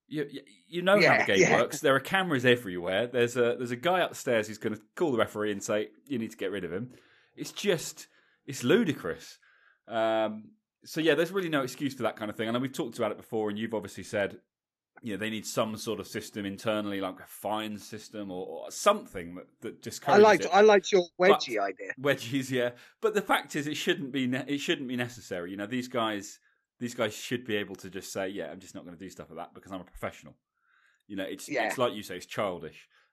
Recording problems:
none

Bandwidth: 14 kHz